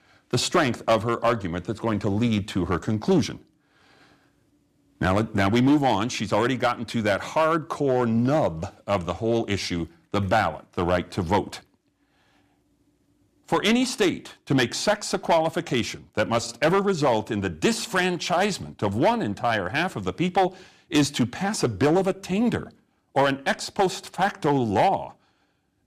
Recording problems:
distortion; slight; 3% of the sound clipped

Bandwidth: 15 kHz